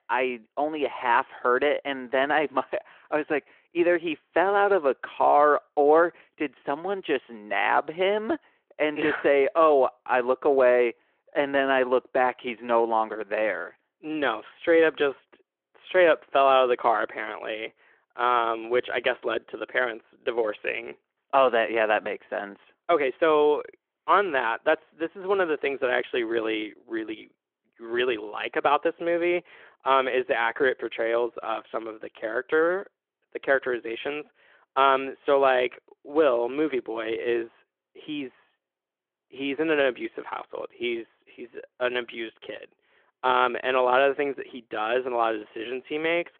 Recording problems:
phone-call audio

